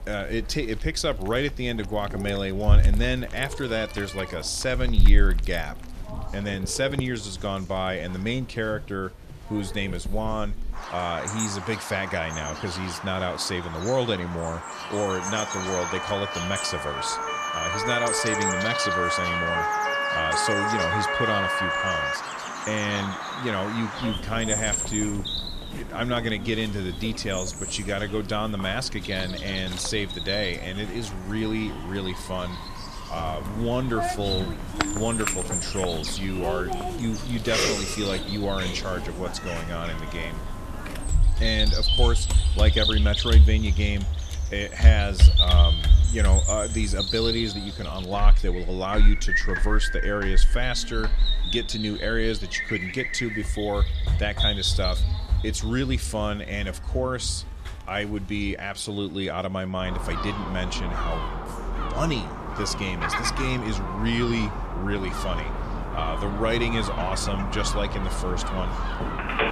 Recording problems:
animal sounds; very loud; throughout; 1 dB above the speech
chatter from many people; noticeable; throughout; 20 dB below the speech
siren; loud; from 15 to 22 s; peak 5 dB above the speech
doorbell; faint; from 39 to 42 s; peak 15 dB below the speech
phone ringing; loud; at 1:09; peak 2 dB above the speech

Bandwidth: 14 kHz